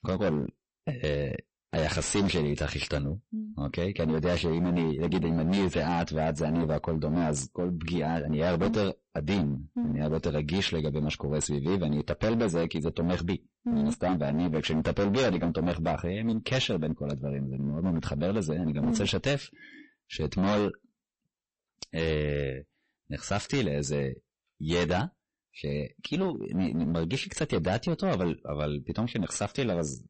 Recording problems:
distortion; heavy; 17% of the sound clipped
garbled, watery; slightly; nothing above 8 kHz

